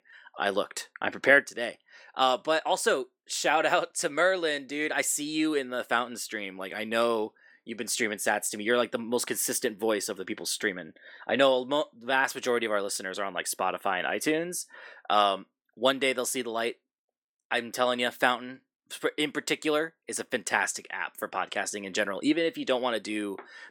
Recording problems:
thin; somewhat; fading below 300 Hz

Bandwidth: 17 kHz